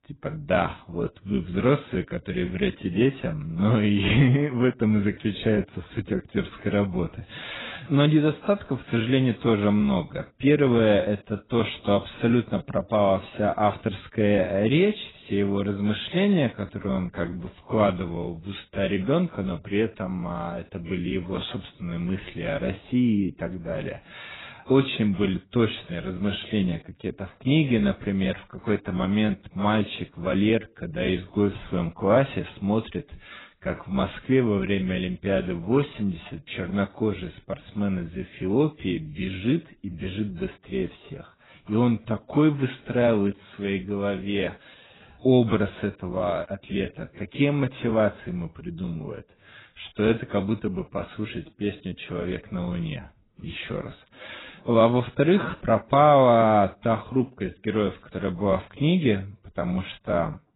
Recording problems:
garbled, watery; badly; nothing above 4 kHz
wrong speed, natural pitch; too slow; 0.7 times normal speed

